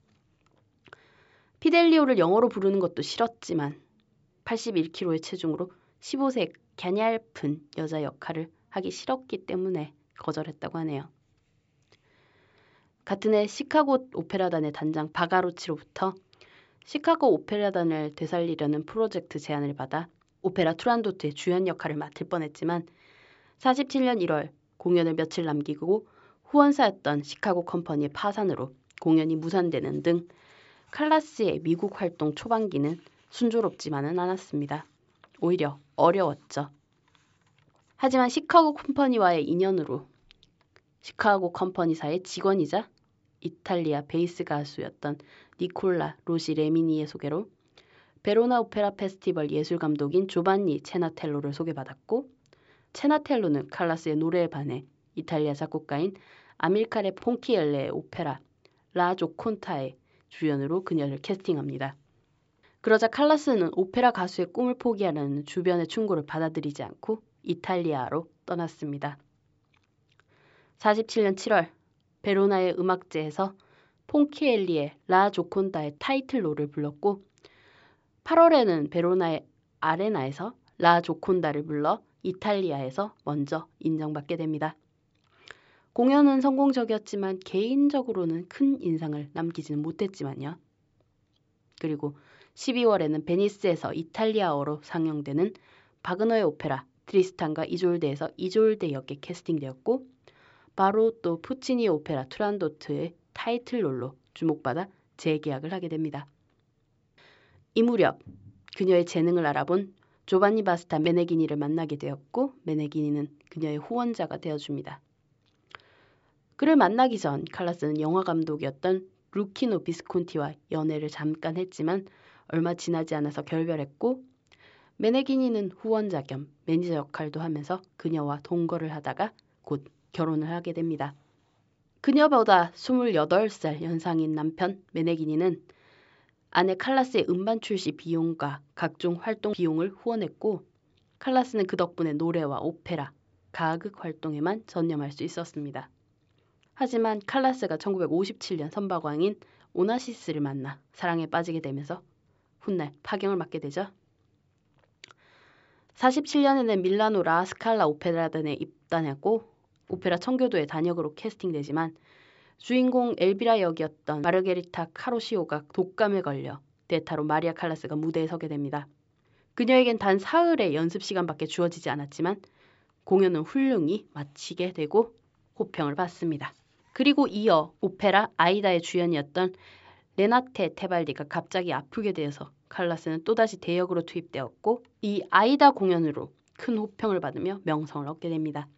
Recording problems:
high frequencies cut off; noticeable; nothing above 8 kHz

